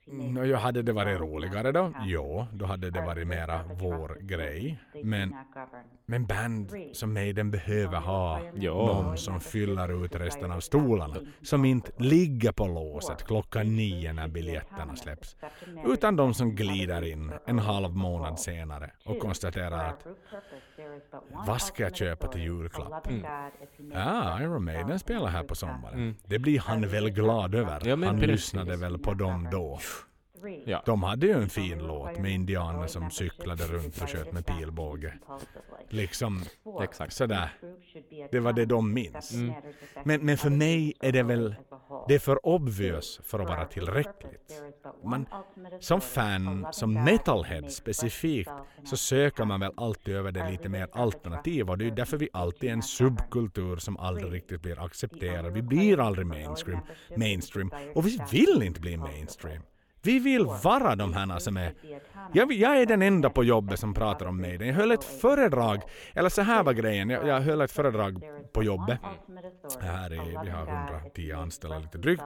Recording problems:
voice in the background; noticeable; throughout; 15 dB below the speech

